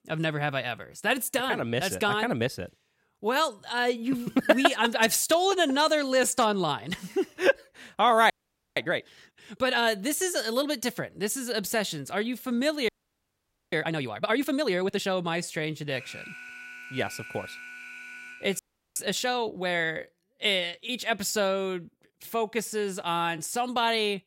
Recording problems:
audio freezing; at 8.5 s, at 13 s for 1 s and at 19 s
alarm; faint; from 16 to 19 s; peak 15 dB below the speech

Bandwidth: 16 kHz